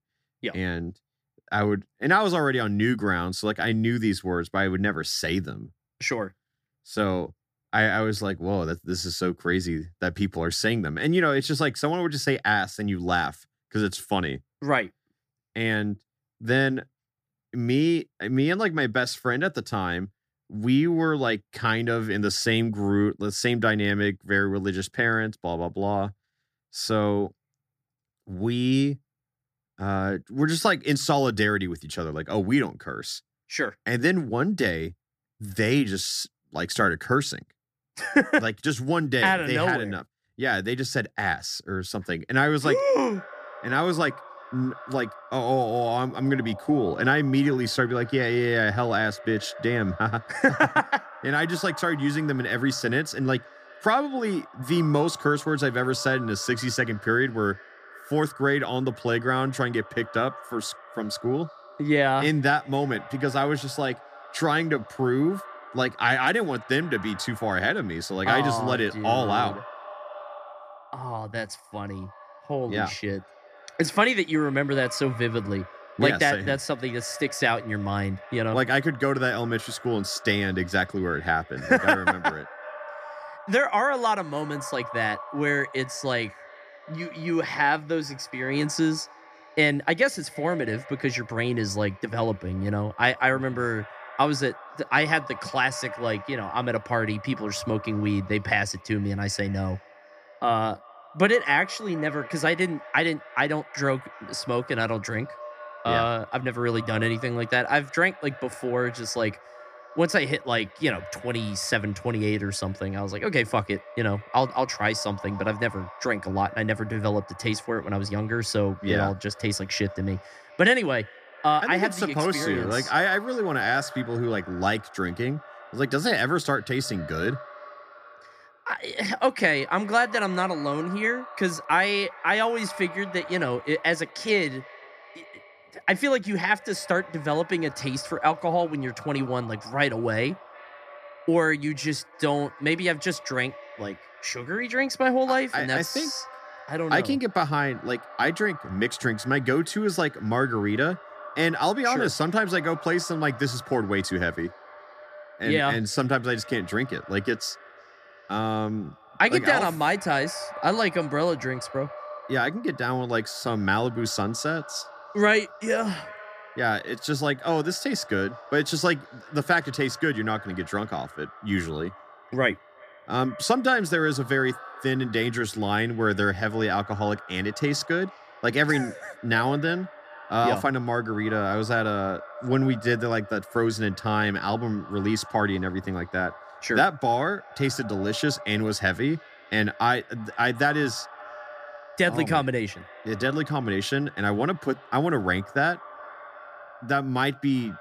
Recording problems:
echo of what is said; noticeable; from 43 s on; 360 ms later, 20 dB below the speech

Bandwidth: 15 kHz